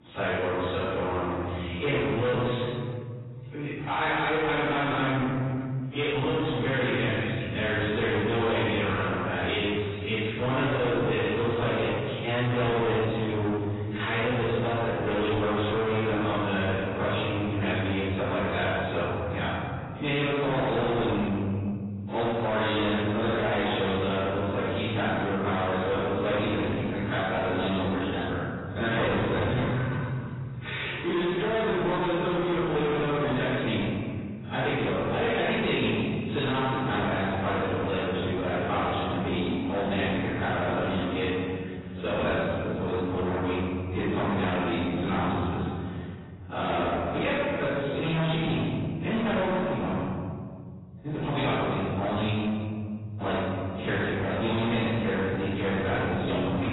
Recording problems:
distortion; heavy; 8 dB below the speech
room echo; strong; dies away in 2 s
off-mic speech; far
garbled, watery; badly; nothing above 4 kHz

